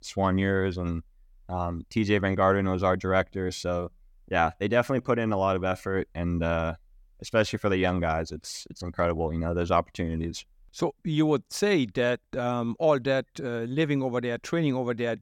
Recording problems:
none

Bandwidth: 17.5 kHz